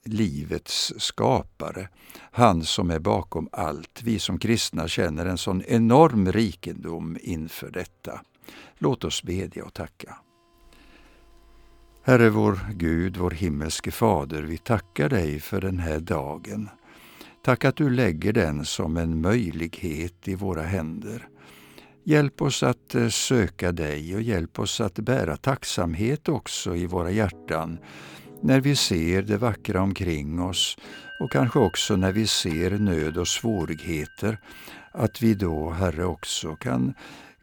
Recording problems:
background music; faint; throughout; 25 dB below the speech

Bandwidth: 18.5 kHz